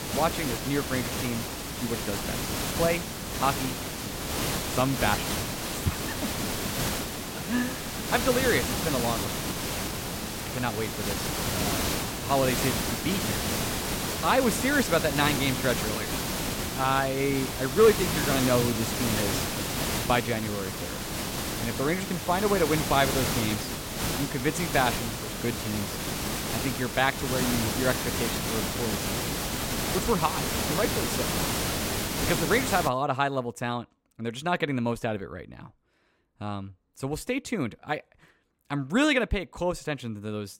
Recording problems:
hiss; loud; until 33 s; 1 dB below the speech

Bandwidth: 16.5 kHz